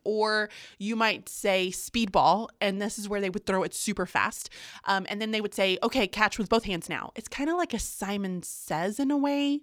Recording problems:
uneven, jittery; strongly; from 1 to 7 s

